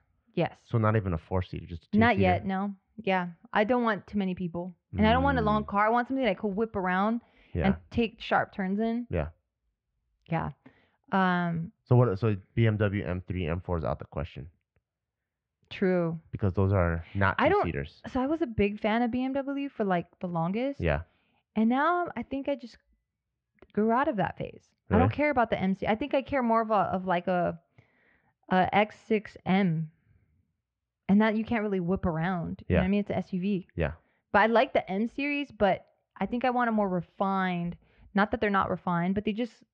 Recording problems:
muffled; very; fading above 3 kHz

